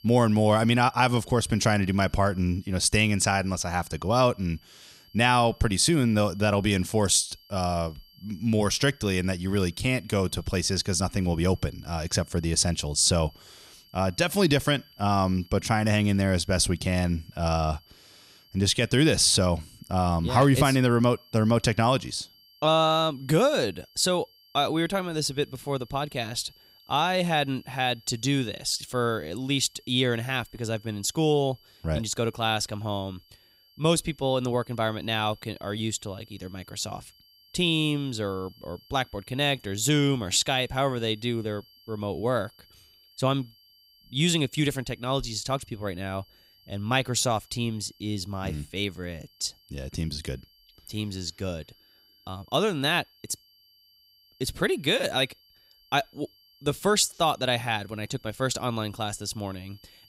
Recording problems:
high-pitched whine; faint; throughout; 4.5 kHz, 30 dB below the speech

